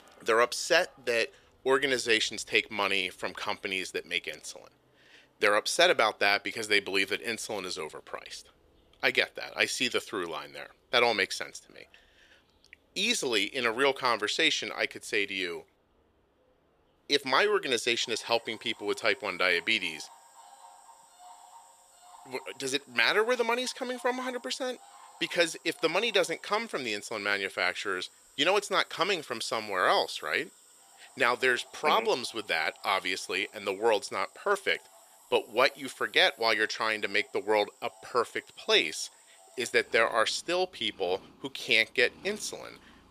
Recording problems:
thin; somewhat; fading below 450 Hz
animal sounds; faint; throughout; 25 dB below the speech

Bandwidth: 14.5 kHz